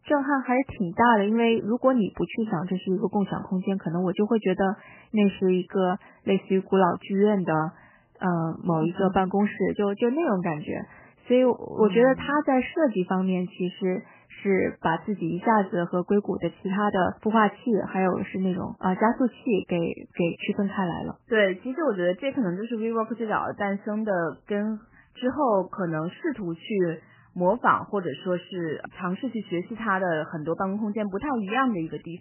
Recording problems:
garbled, watery; badly; nothing above 3 kHz

